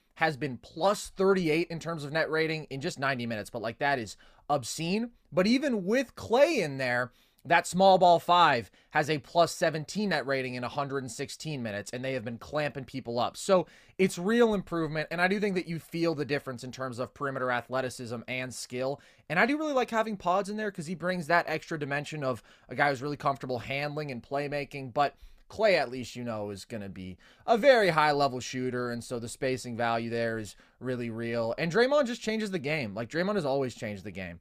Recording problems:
none

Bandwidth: 15 kHz